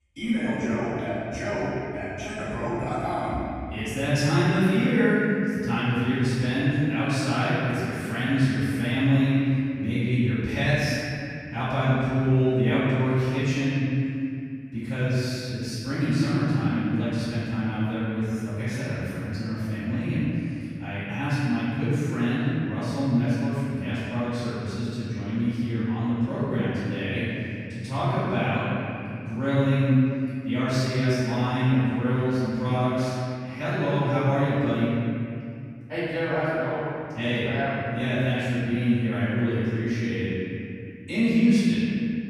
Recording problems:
room echo; strong; dies away in 2.6 s
off-mic speech; far

